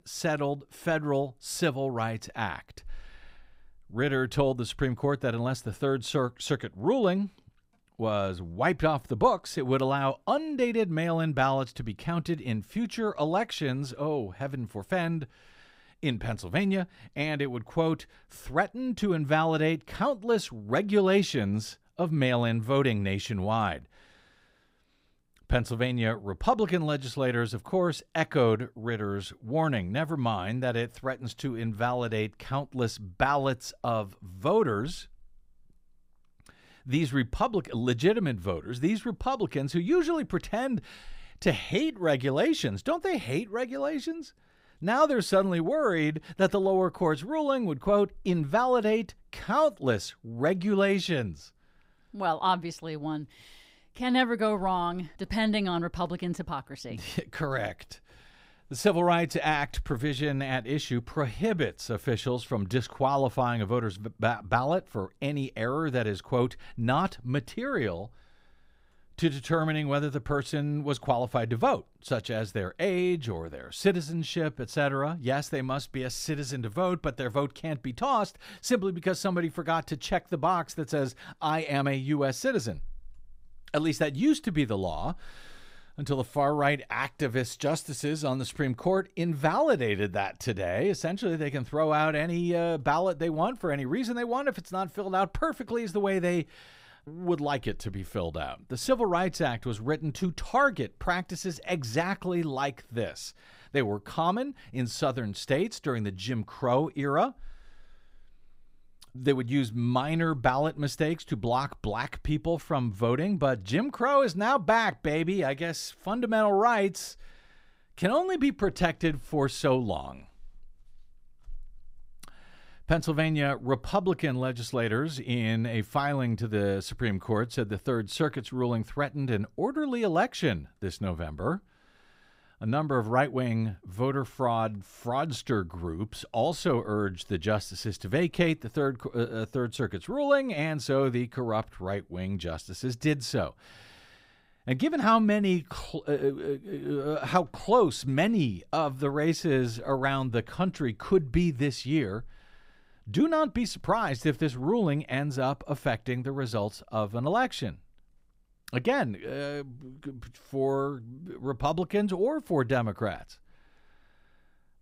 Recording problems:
none

